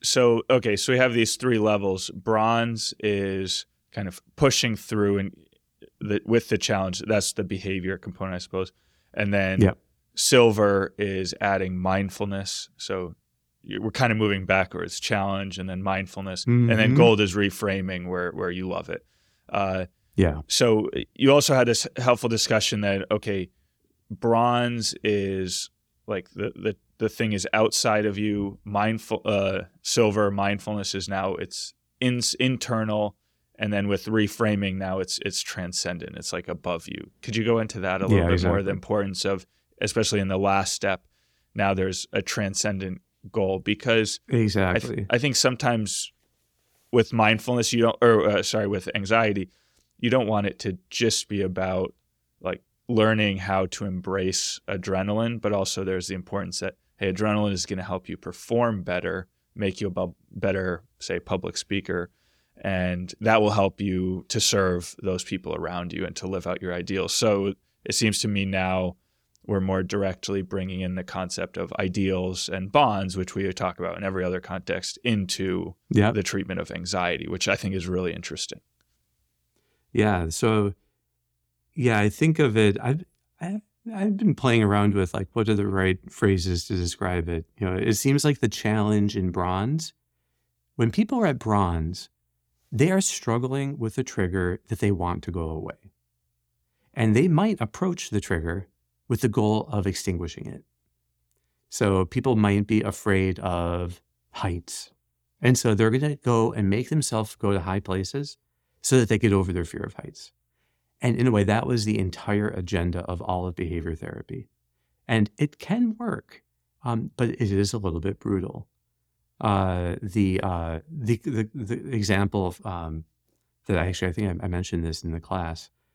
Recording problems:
none

